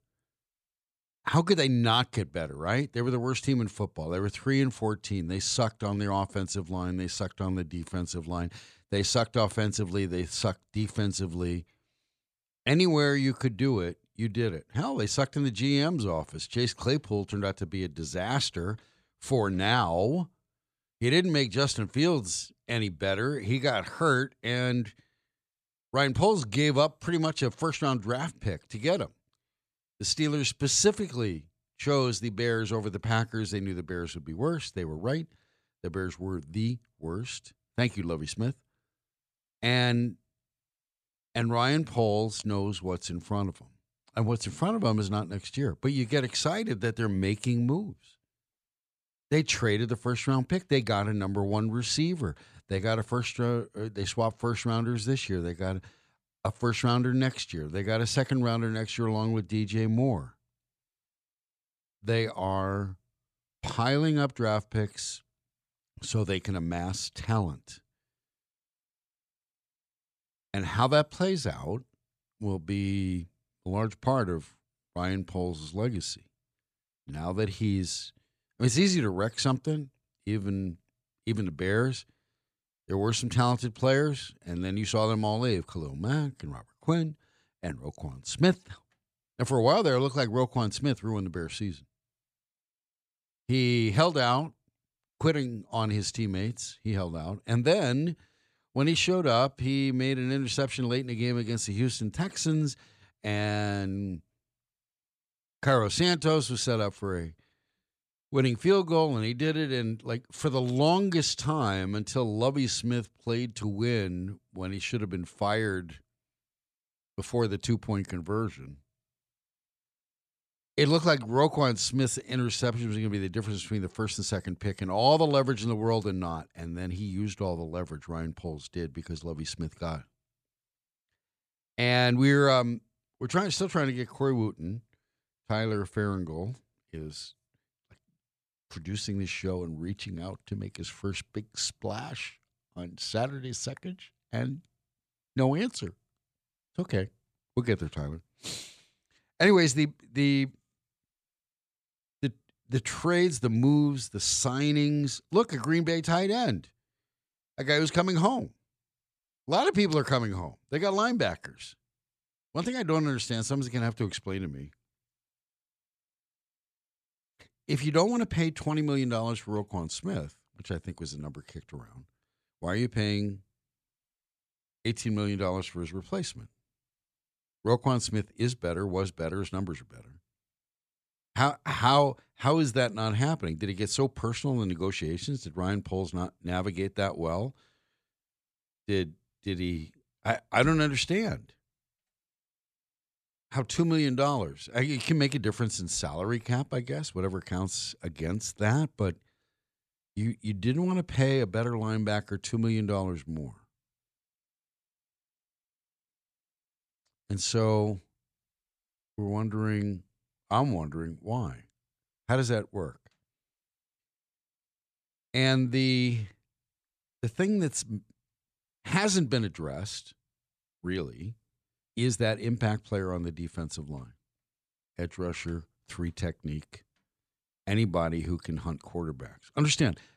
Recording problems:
none

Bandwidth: 14.5 kHz